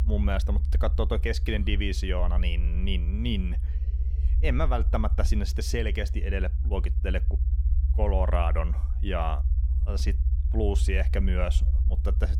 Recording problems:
low rumble; noticeable; throughout; 15 dB below the speech

